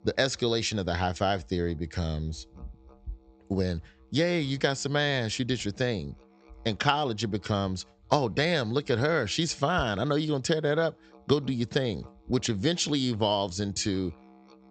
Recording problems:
high frequencies cut off; noticeable; nothing above 8 kHz
background music; faint; throughout; 30 dB below the speech

